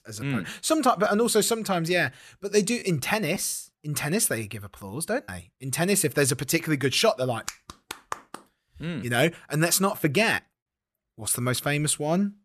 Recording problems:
choppy; occasionally; 1% of the speech affected

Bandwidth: 13.5 kHz